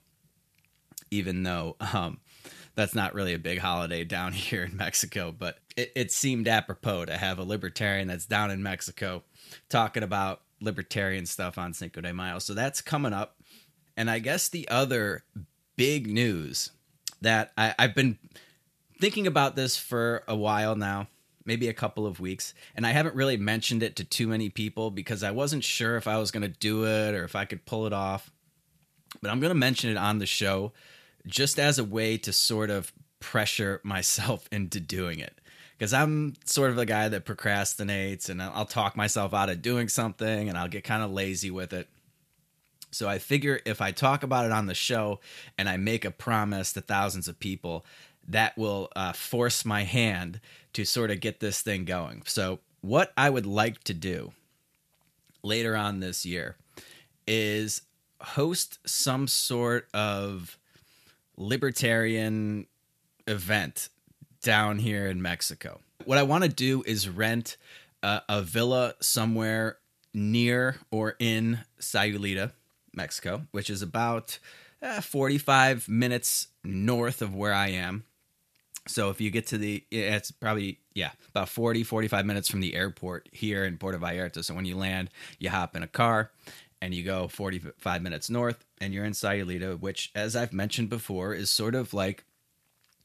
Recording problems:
uneven, jittery; strongly; from 5.5 s to 1:20

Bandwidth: 14.5 kHz